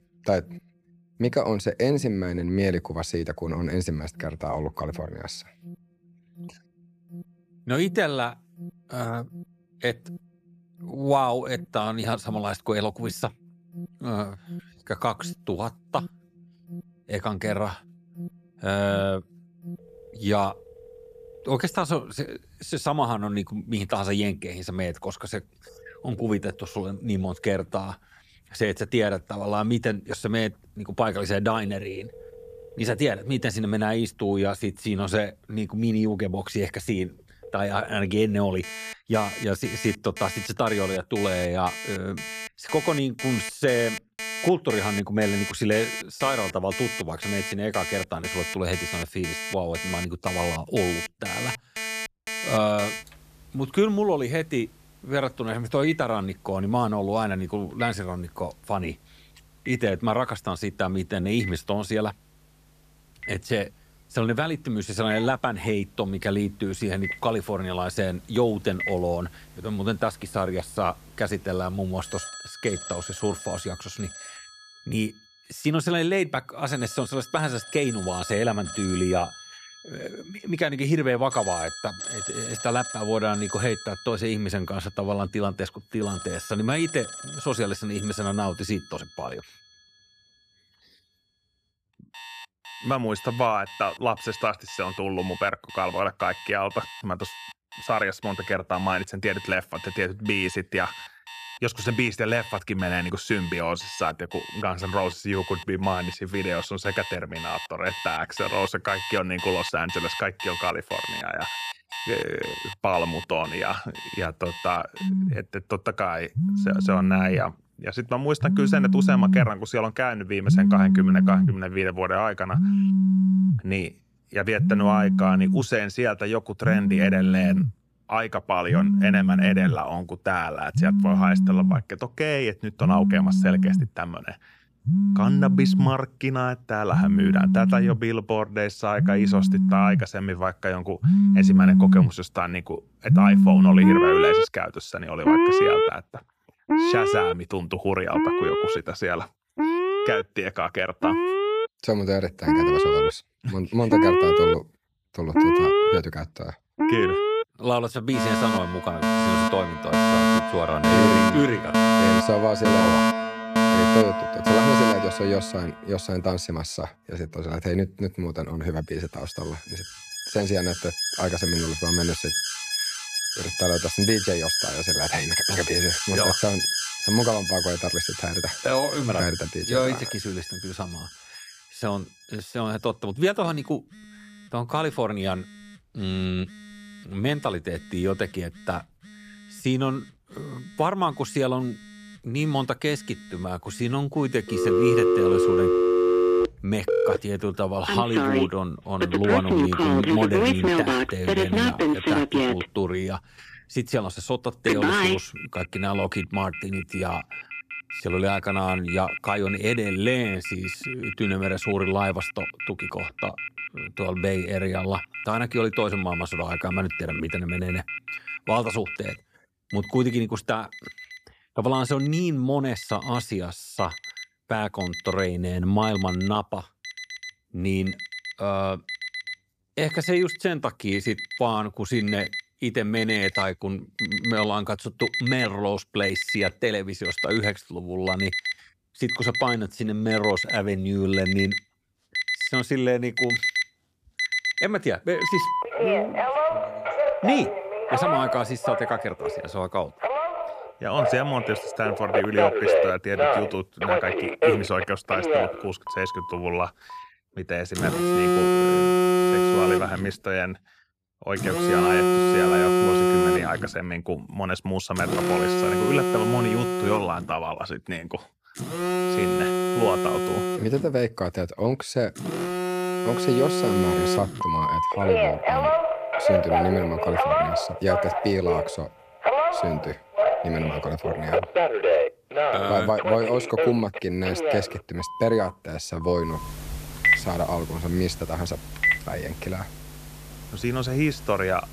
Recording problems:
alarms or sirens; very loud; throughout; 3 dB above the speech

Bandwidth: 14.5 kHz